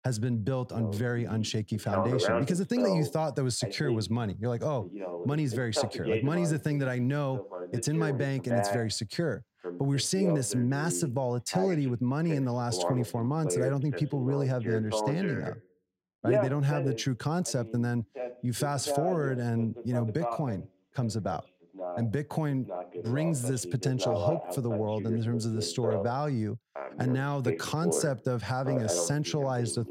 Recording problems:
voice in the background; loud; throughout; 5 dB below the speech

